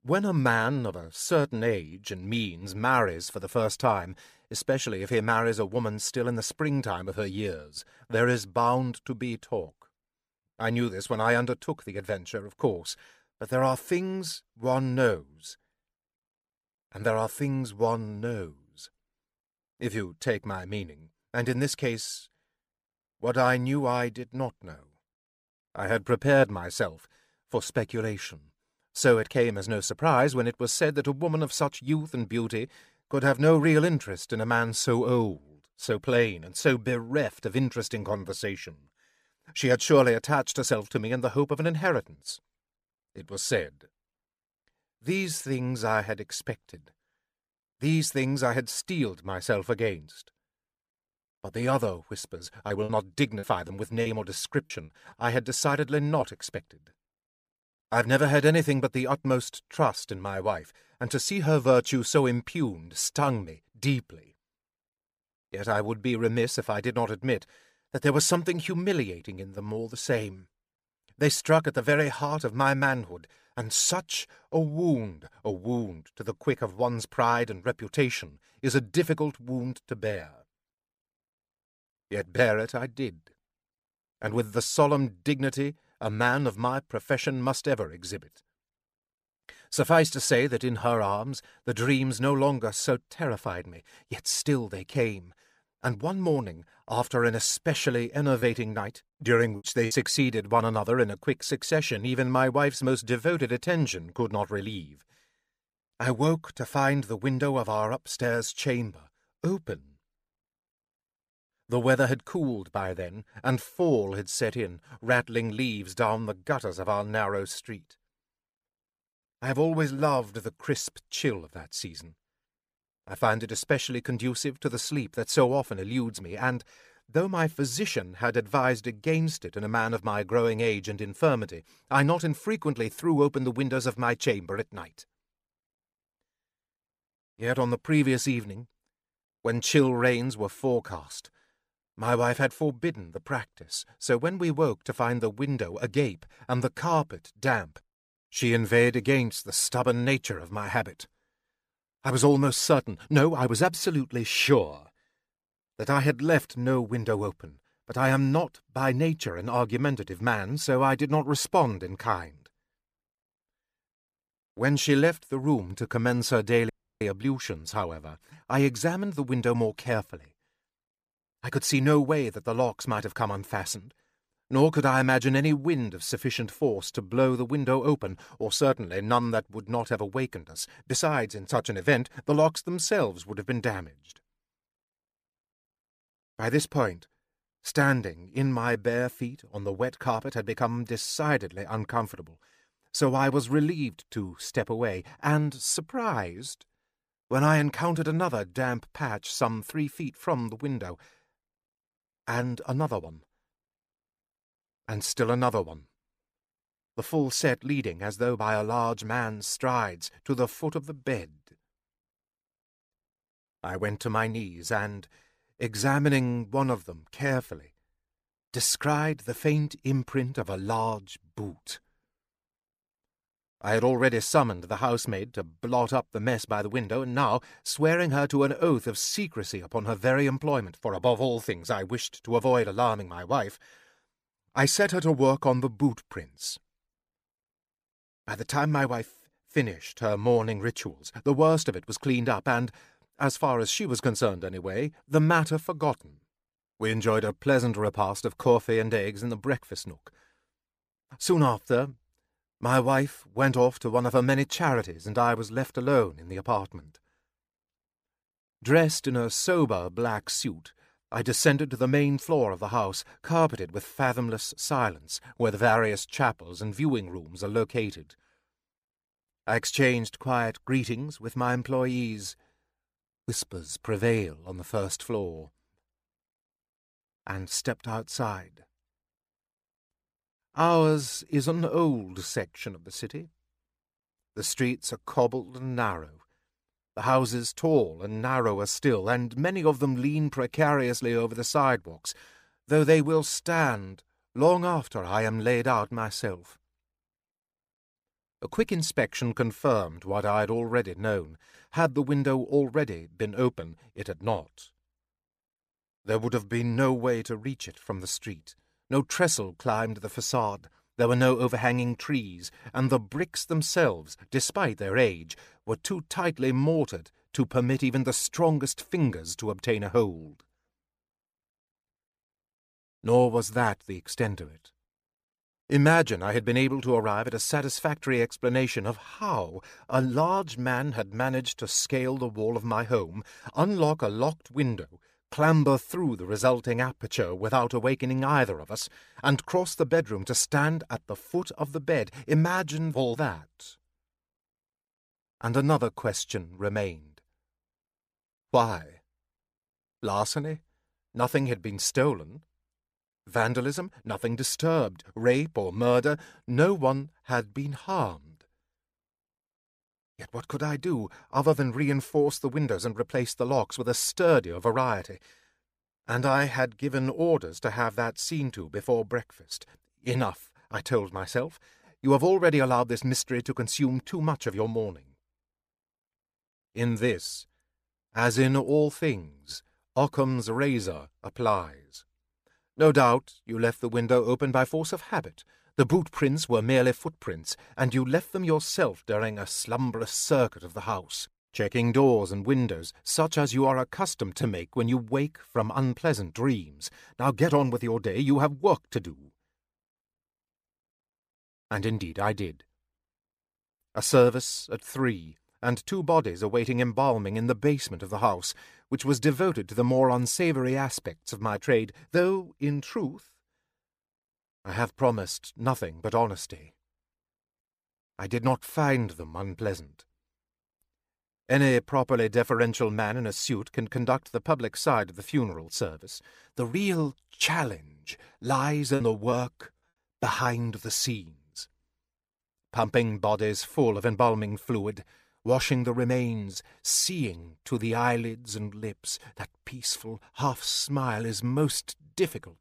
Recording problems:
choppy; very; from 53 to 56 s, from 1:38 to 1:41 and from 7:09 to 7:10; 7% of the speech affected
audio cutting out; at 2:47

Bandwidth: 15 kHz